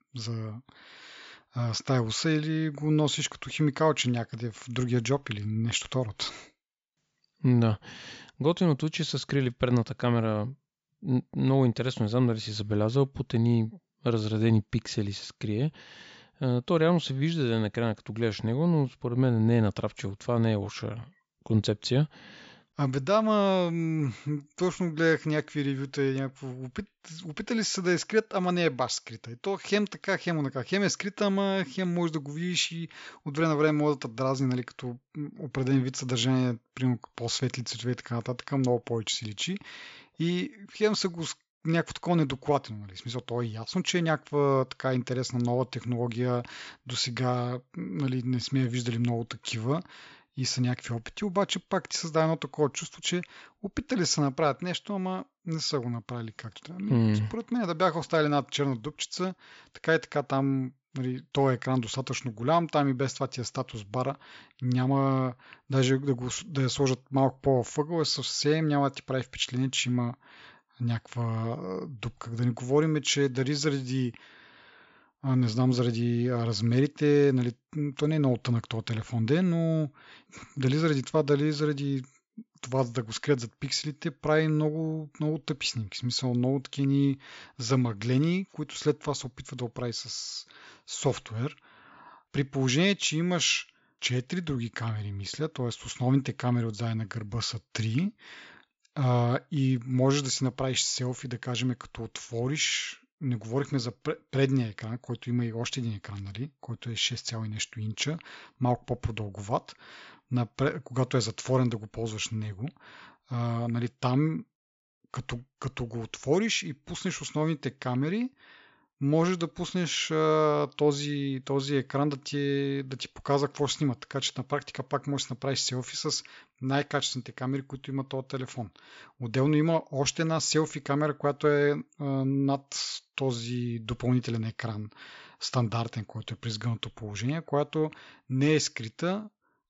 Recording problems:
high frequencies cut off; noticeable; nothing above 7.5 kHz

